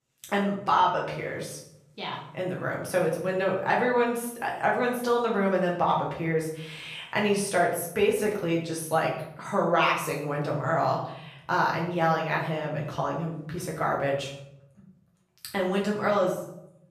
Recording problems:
off-mic speech; far
room echo; noticeable; dies away in 0.7 s

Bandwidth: 14.5 kHz